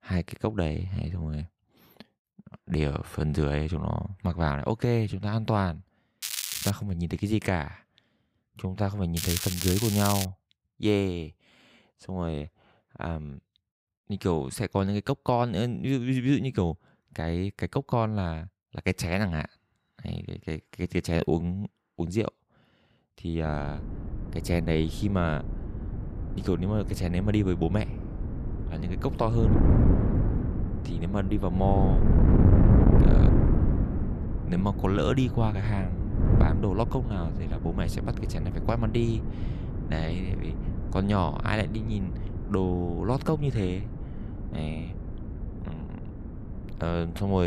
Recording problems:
wind noise on the microphone; heavy; from 23 s on; 5 dB below the speech
crackling; loud; at 6 s and from 9 to 10 s; 2 dB below the speech
abrupt cut into speech; at the end

